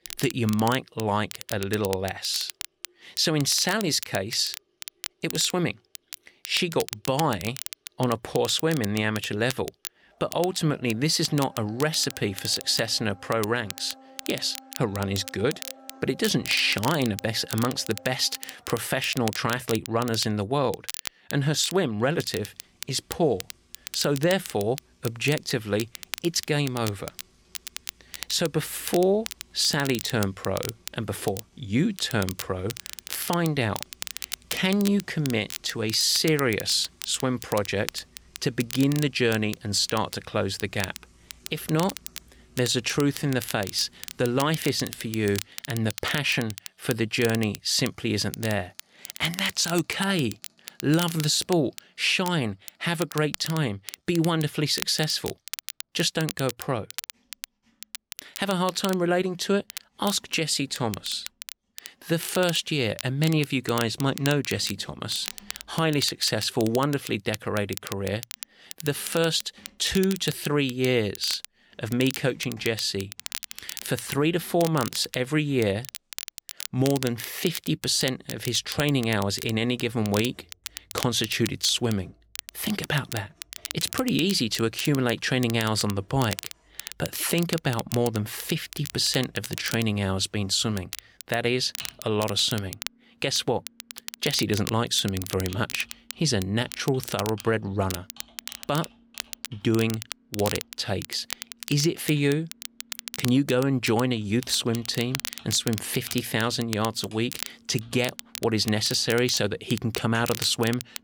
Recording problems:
crackle, like an old record; noticeable; 10 dB below the speech
household noises; faint; throughout; 30 dB below the speech

